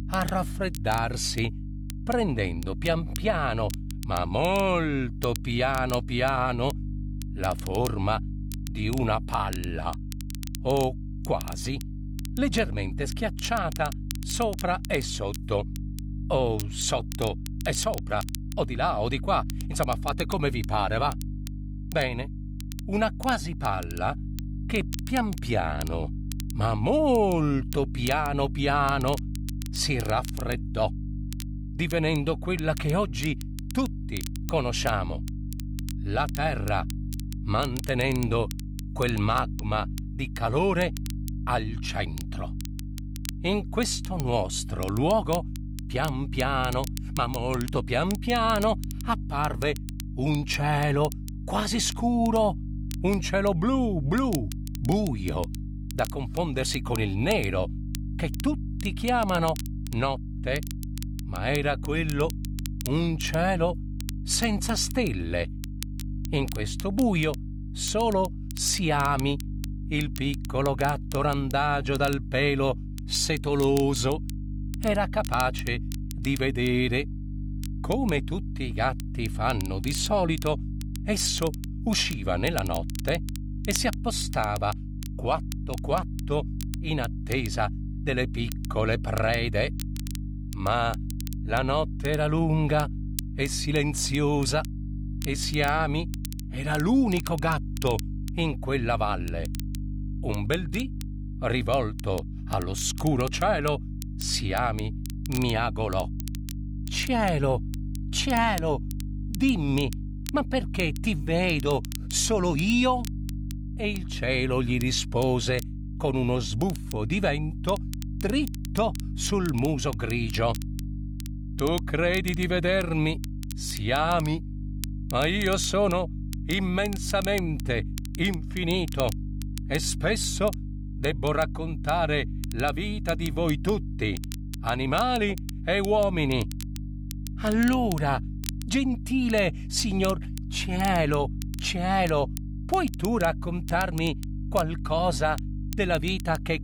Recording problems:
electrical hum; noticeable; throughout; 50 Hz, 20 dB below the speech
crackle, like an old record; noticeable; 15 dB below the speech

